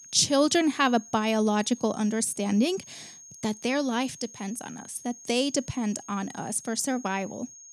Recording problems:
high-pitched whine; noticeable; throughout; 6.5 kHz, 20 dB below the speech

